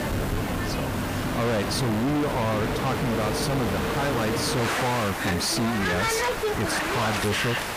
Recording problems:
distortion; heavy; 32% of the sound clipped
train or aircraft noise; loud; throughout; 1 dB below the speech
hiss; noticeable; throughout; 15 dB below the speech

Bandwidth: 15 kHz